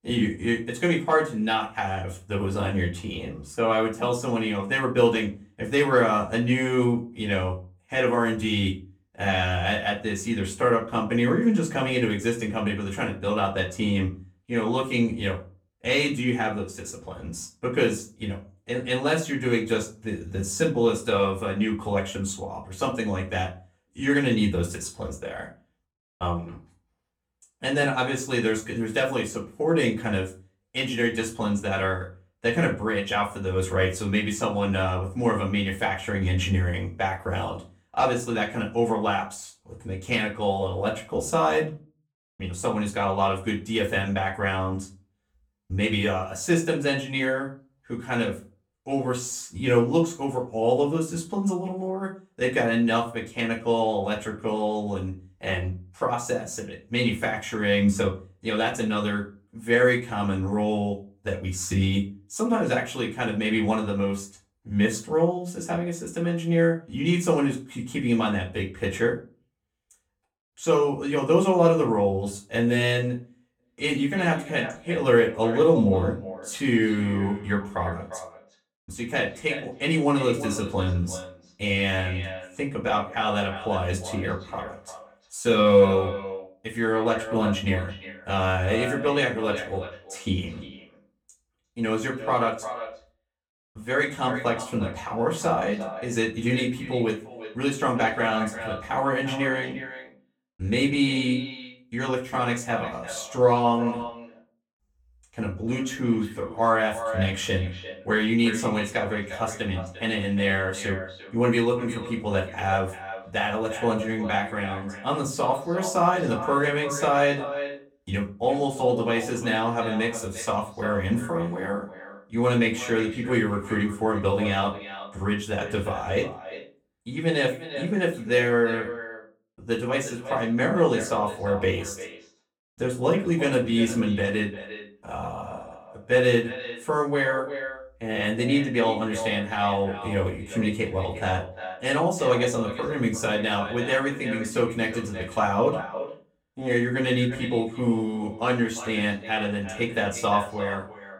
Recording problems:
off-mic speech; far
echo of what is said; noticeable; from 1:14 on; 350 ms later, 10 dB below the speech
room echo; very slight; dies away in 0.3 s

